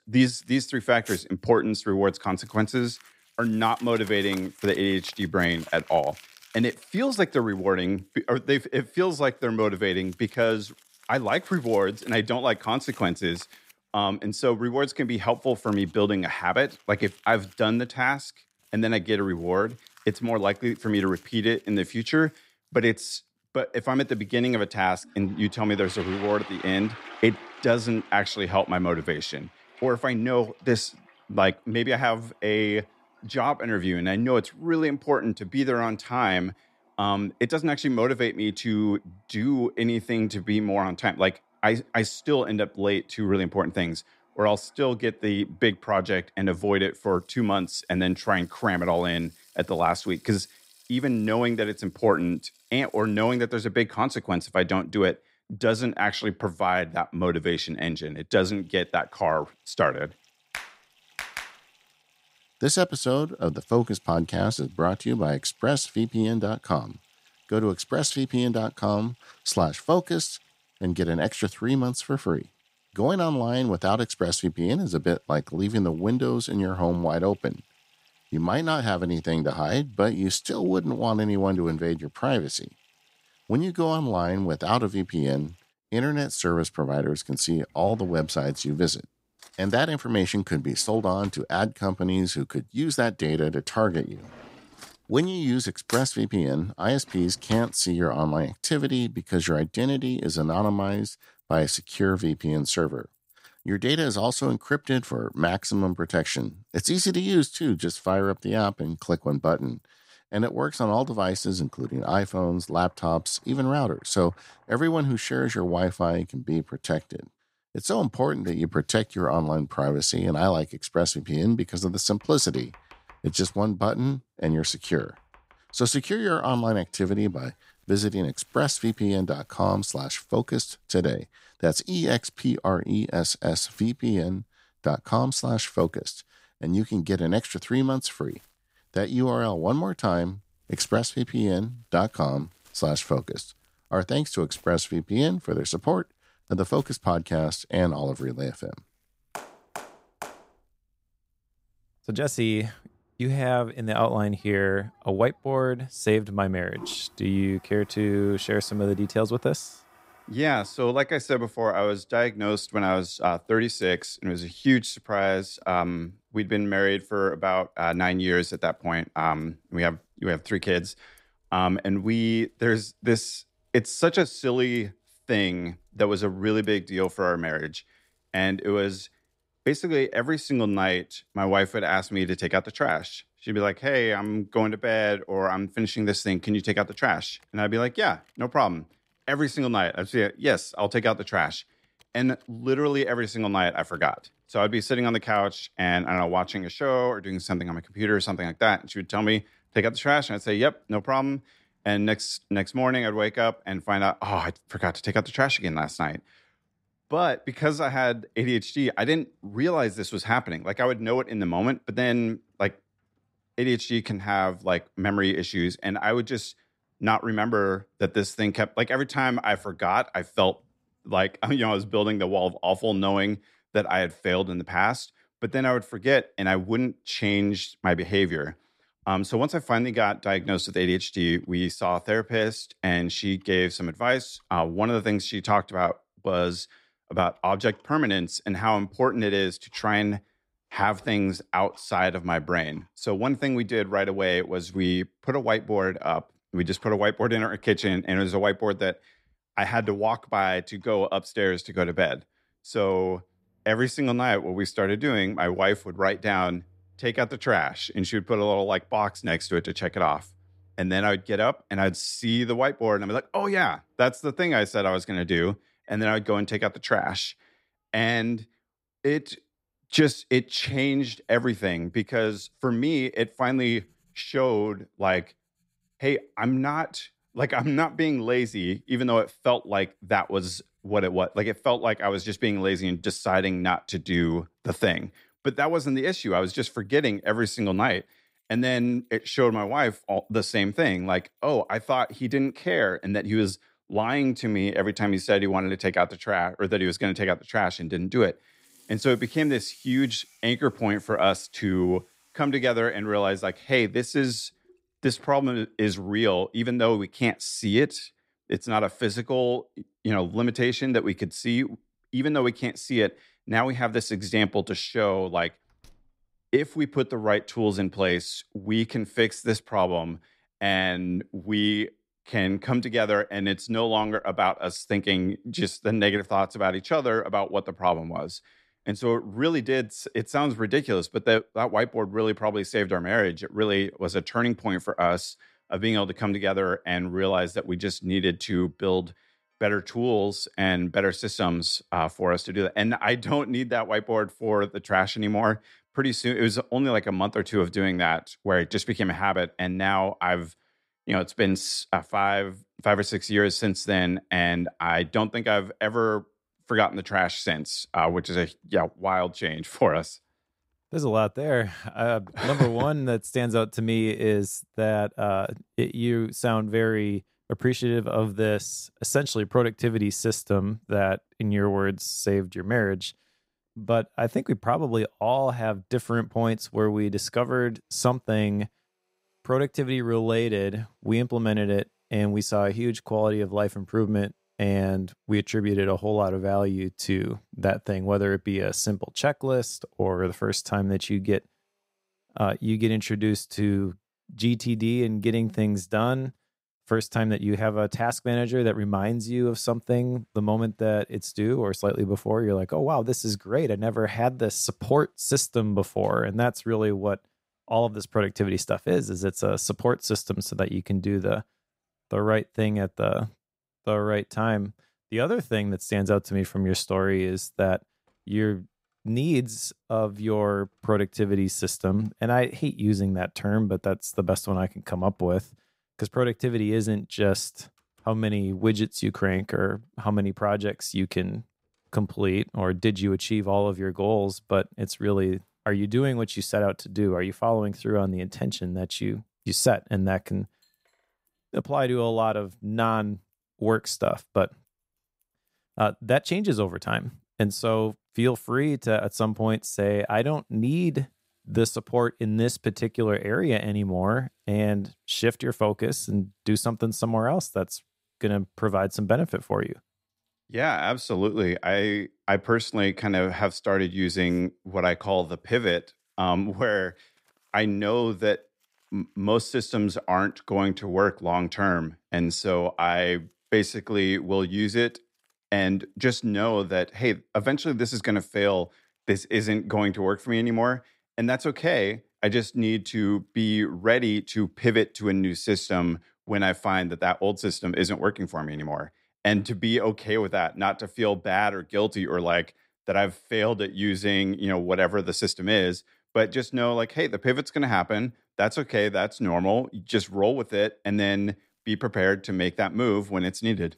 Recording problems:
household noises; faint; throughout; 25 dB below the speech

